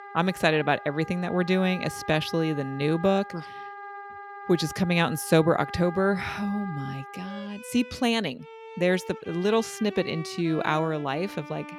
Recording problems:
background music; noticeable; throughout; 15 dB below the speech

